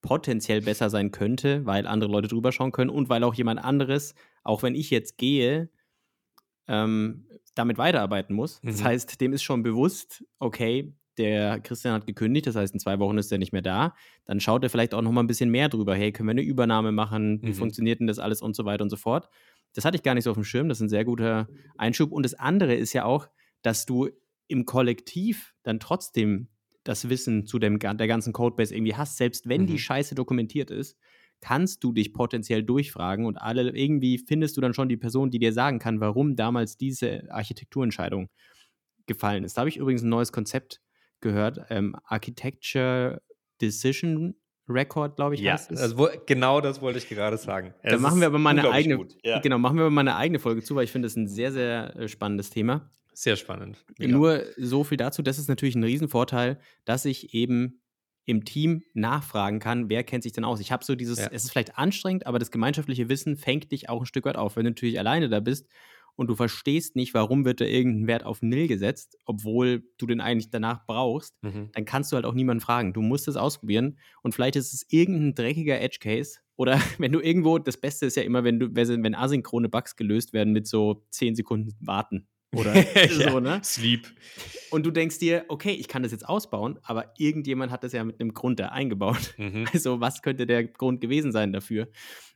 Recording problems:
none

